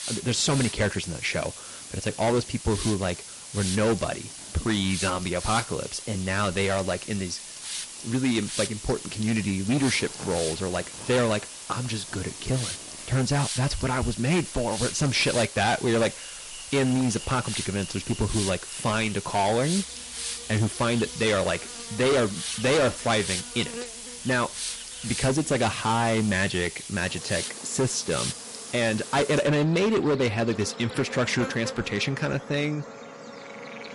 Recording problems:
distortion; heavy; 9% of the sound clipped
garbled, watery; slightly; nothing above 11 kHz
hiss; loud; until 29 s; 9 dB below the speech
animal sounds; noticeable; throughout; 15 dB below the speech

